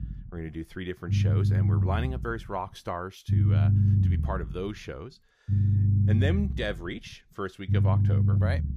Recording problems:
low rumble; loud; throughout; 2 dB below the speech

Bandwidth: 15 kHz